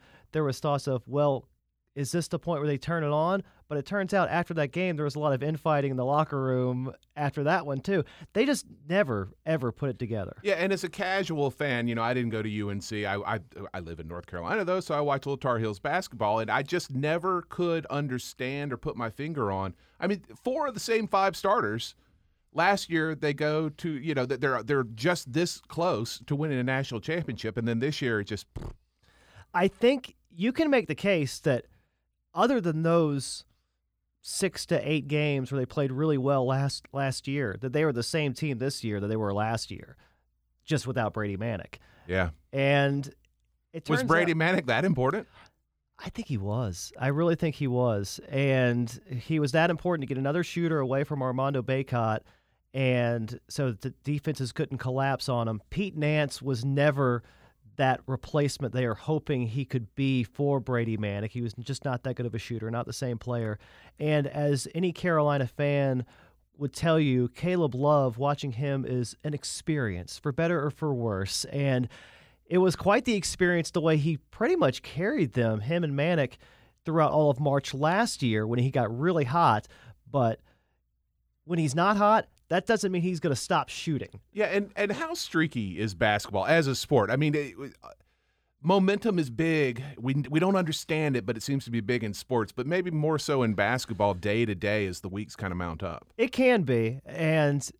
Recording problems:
none

